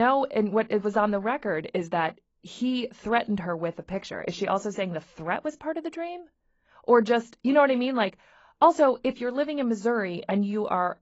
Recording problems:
garbled, watery; badly; nothing above 7.5 kHz
abrupt cut into speech; at the start

